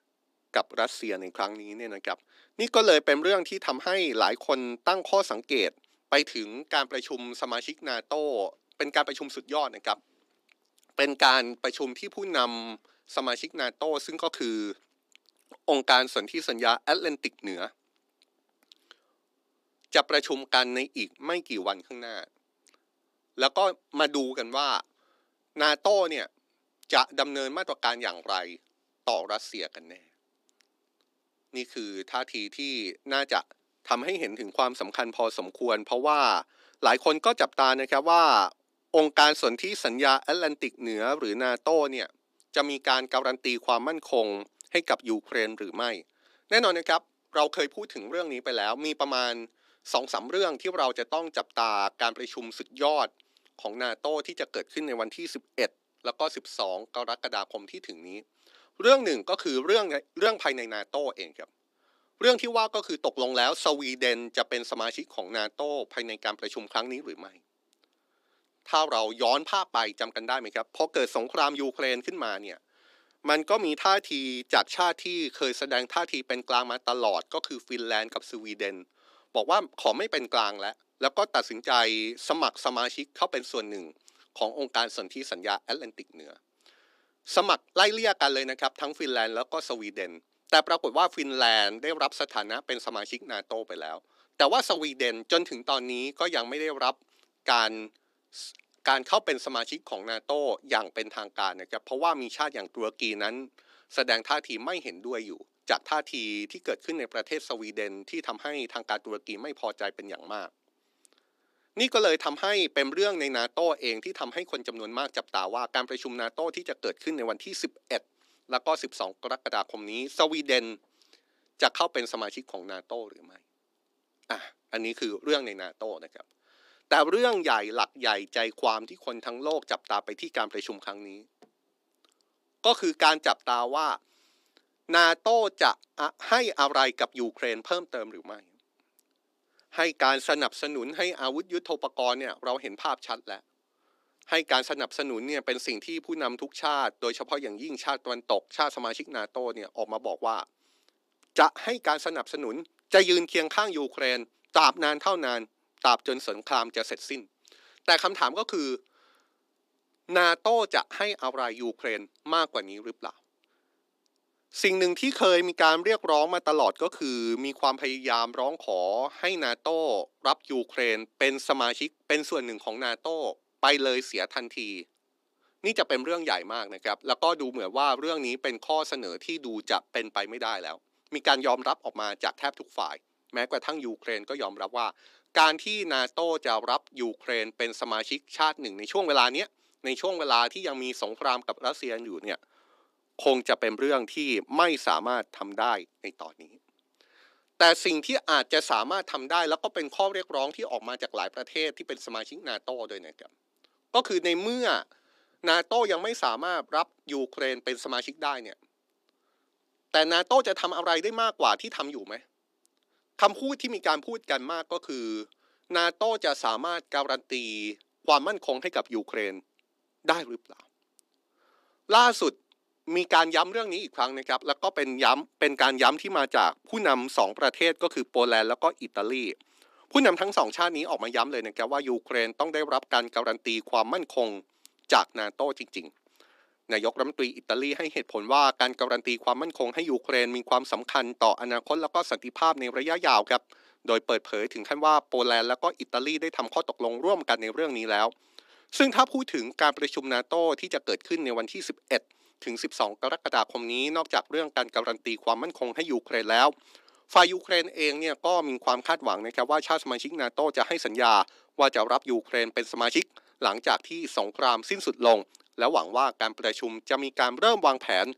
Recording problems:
thin; somewhat; fading below 250 Hz

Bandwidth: 15 kHz